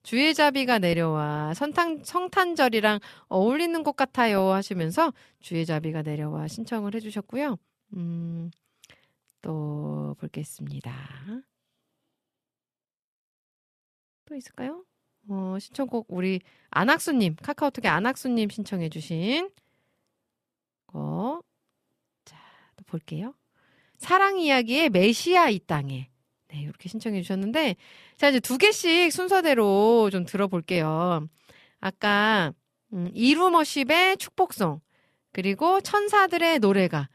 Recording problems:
none

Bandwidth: 14 kHz